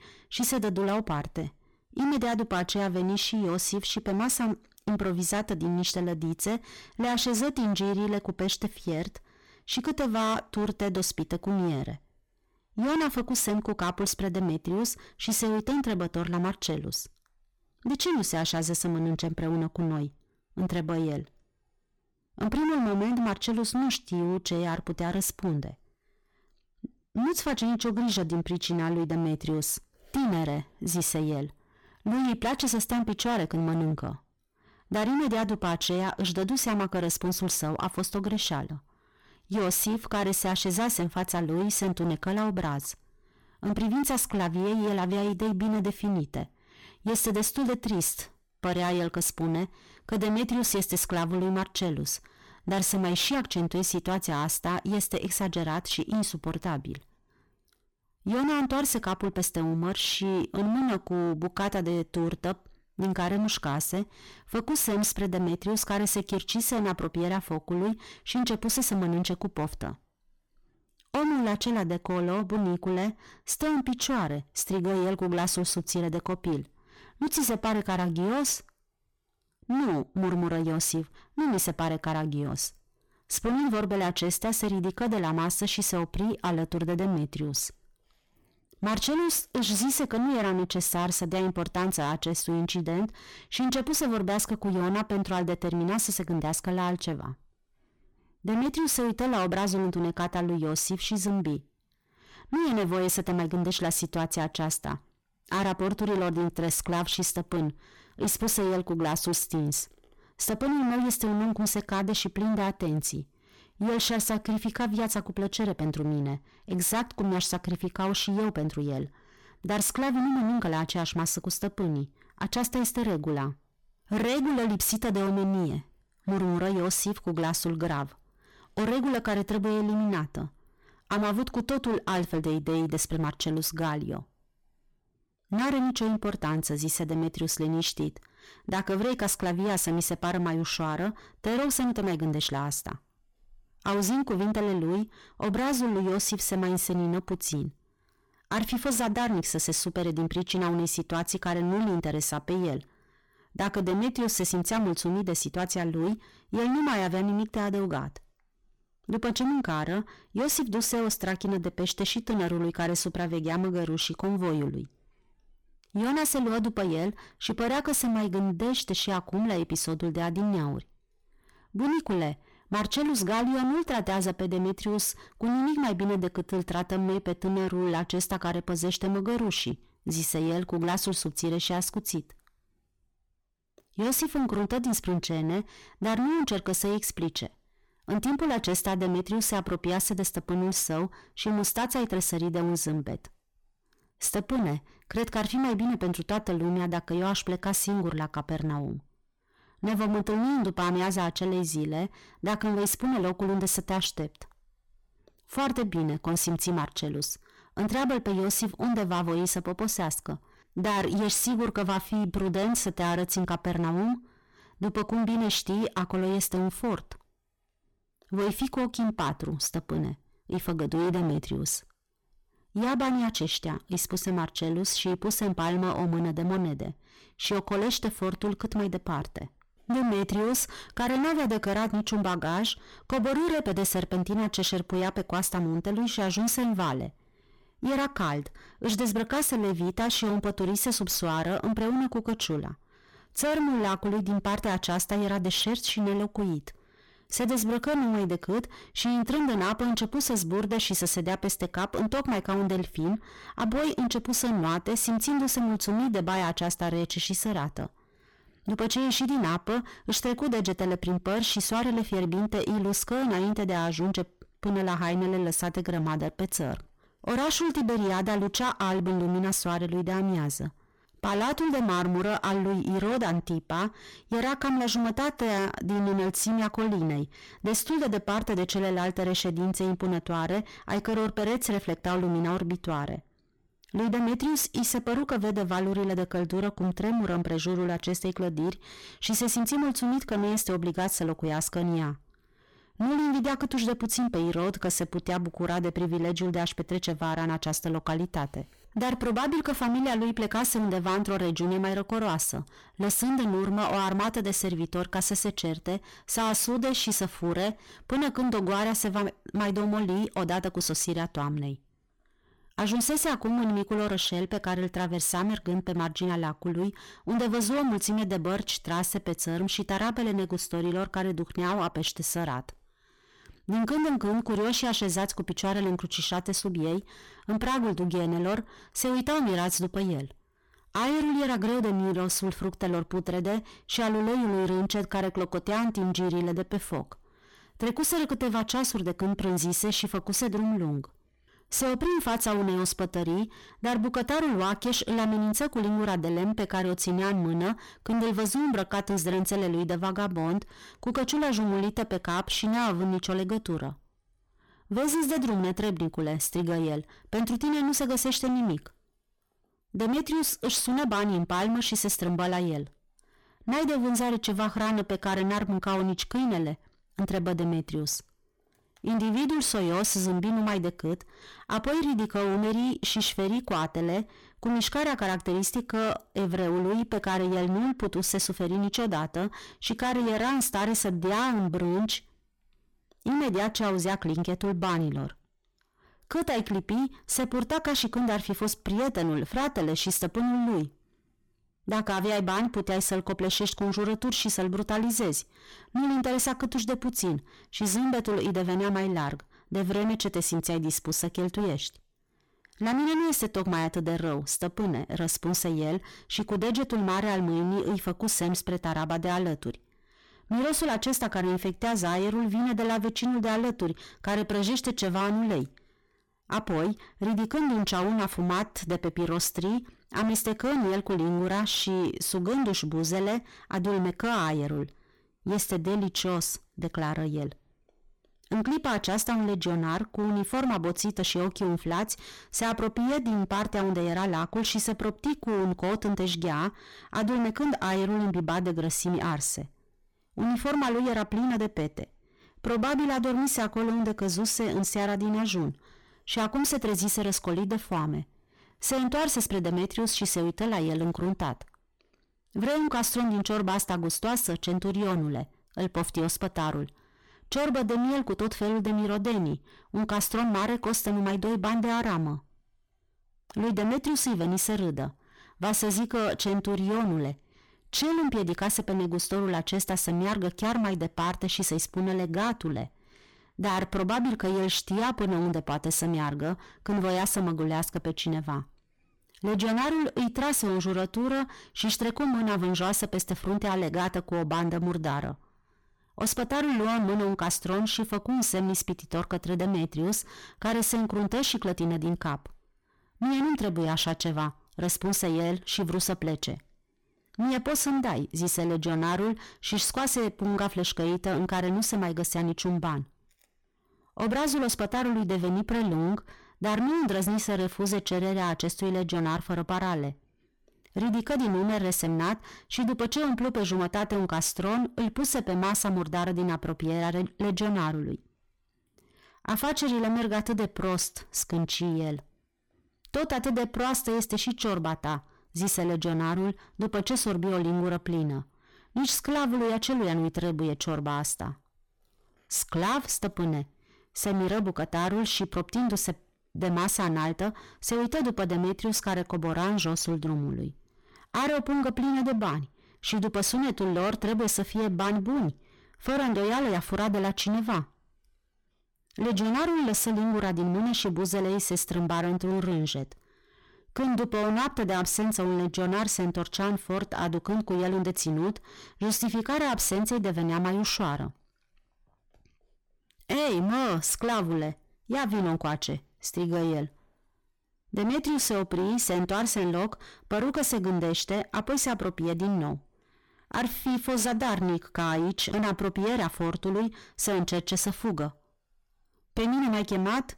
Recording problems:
distortion; heavy; 23% of the sound clipped

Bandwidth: 18 kHz